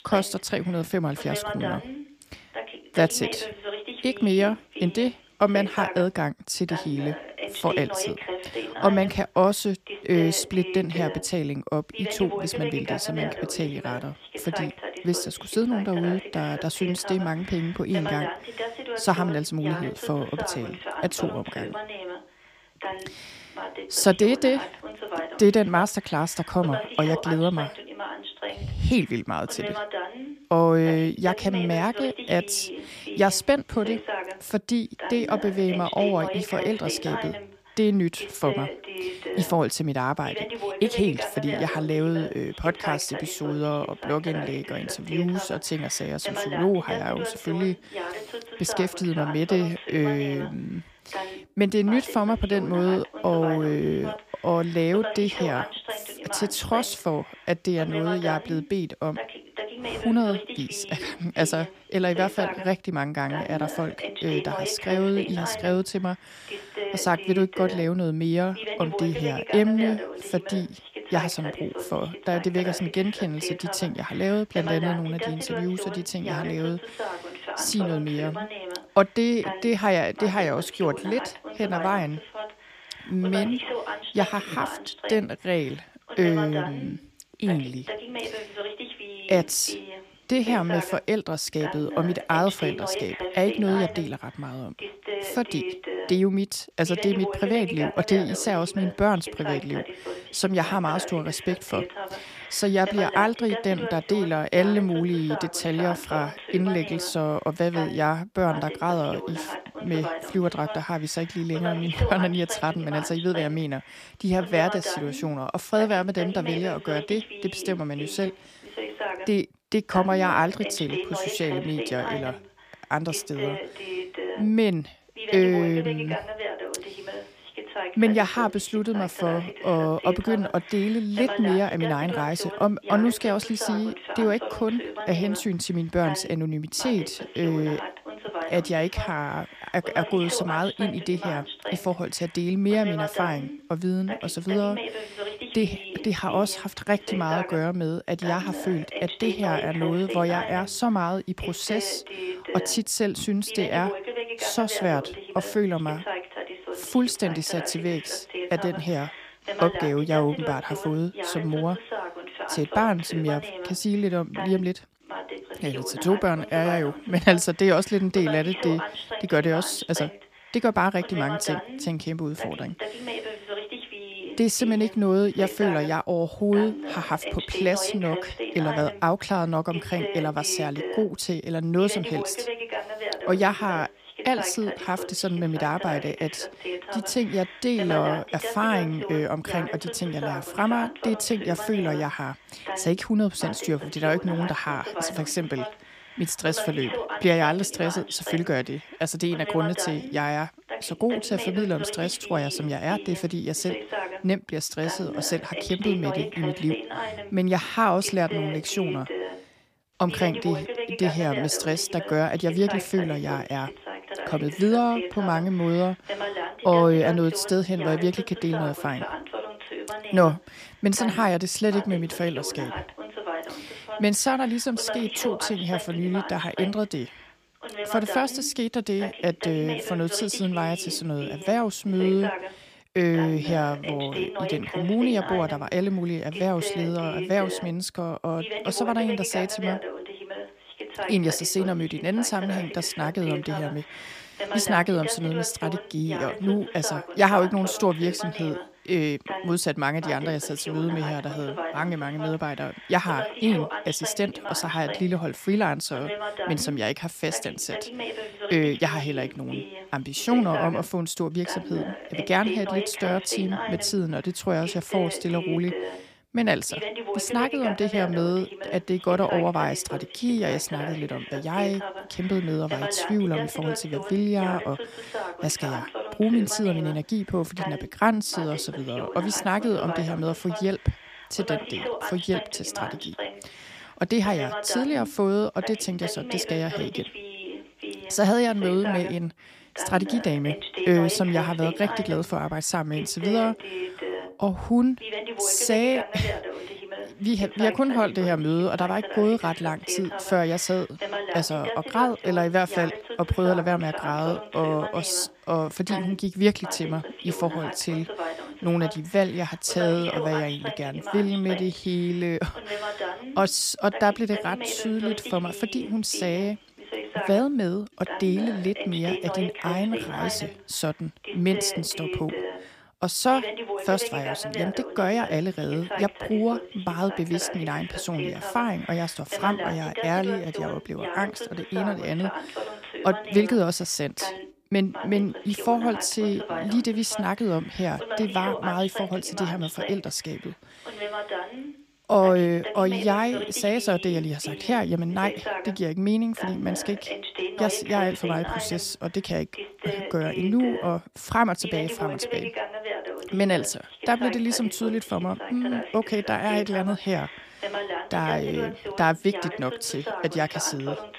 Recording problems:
voice in the background; loud; throughout; 8 dB below the speech

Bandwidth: 15 kHz